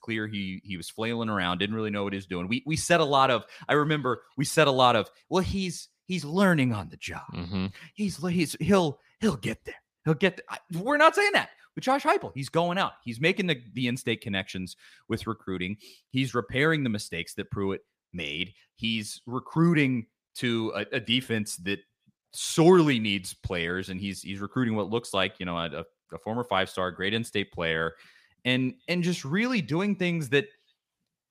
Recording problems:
none

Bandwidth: 15 kHz